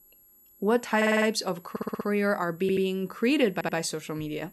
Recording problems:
high-pitched whine; faint; throughout; 11.5 kHz, 25 dB below the speech
audio stuttering; 4 times, first at 1 s

